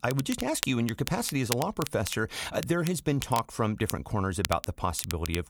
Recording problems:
crackle, like an old record; loud; 8 dB below the speech

